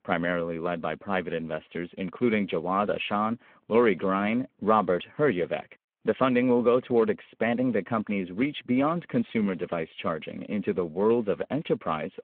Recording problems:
phone-call audio

